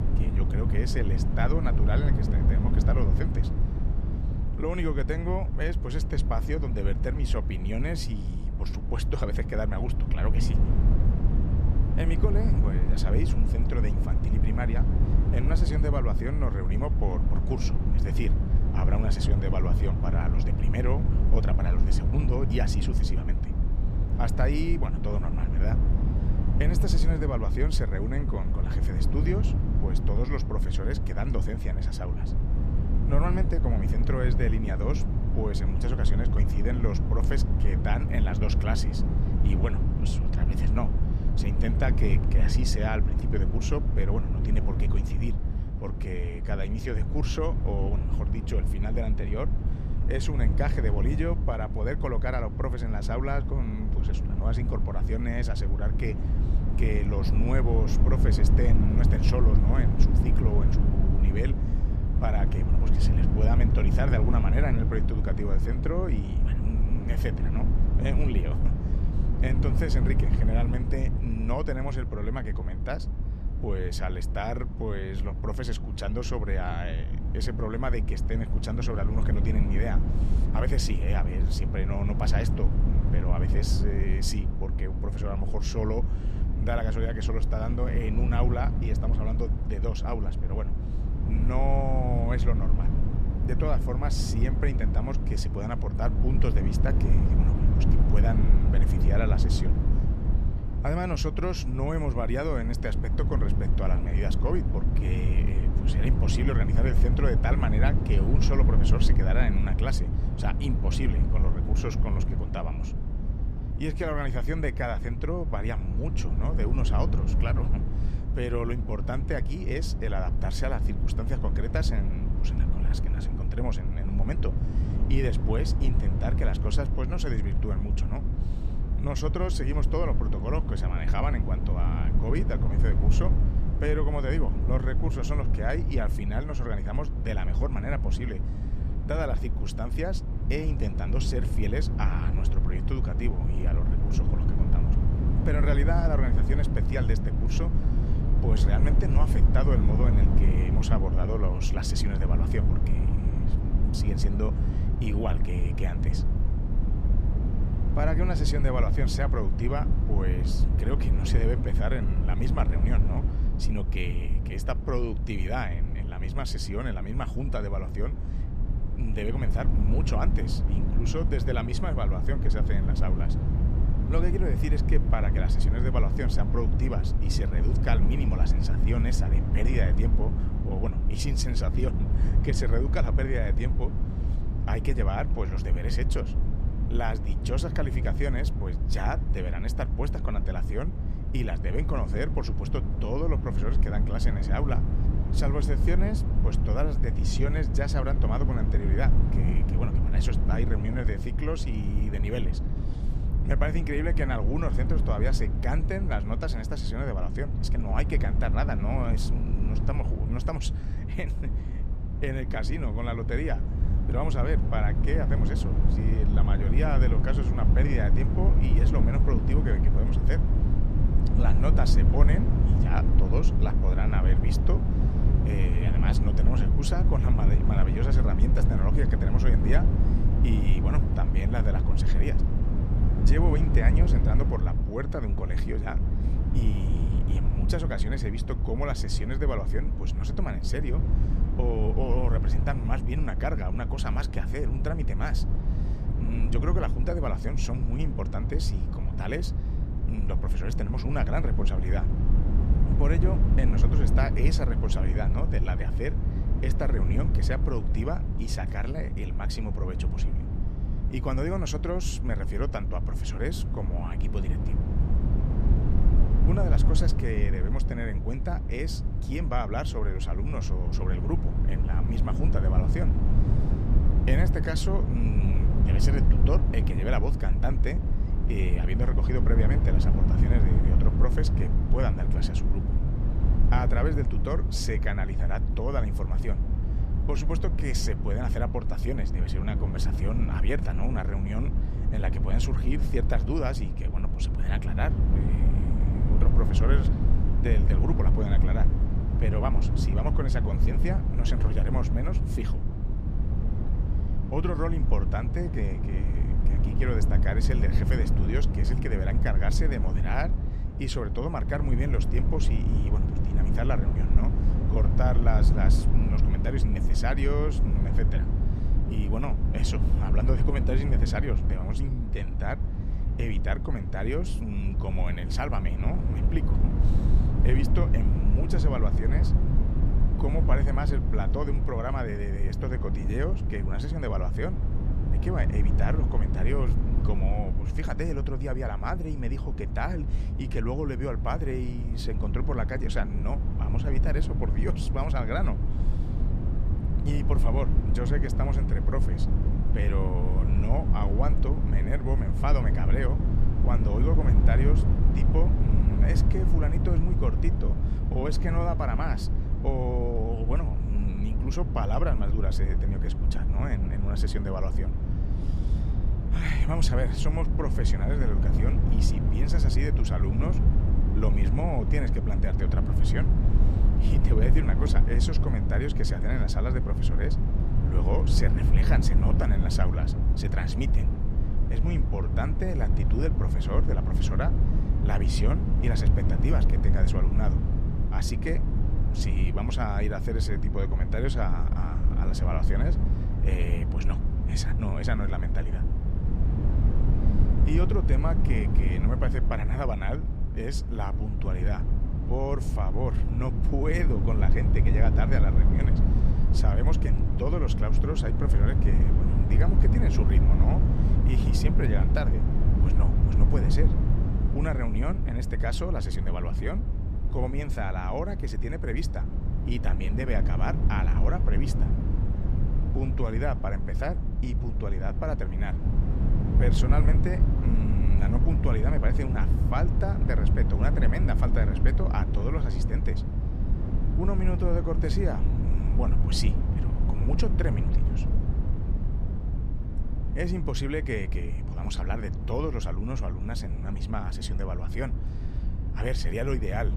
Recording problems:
low rumble; loud; throughout; 4 dB below the speech

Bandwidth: 14.5 kHz